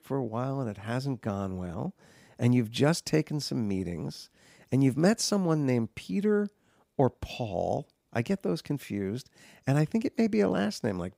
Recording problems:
none

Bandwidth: 15.5 kHz